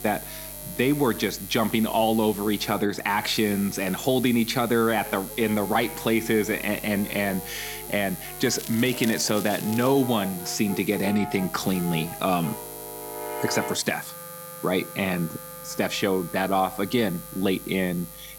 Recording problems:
electrical hum; noticeable; throughout; 50 Hz, 15 dB below the speech
background music; noticeable; throughout; 15 dB below the speech
crackling; noticeable; from 8.5 to 10 s; 15 dB below the speech

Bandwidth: 17.5 kHz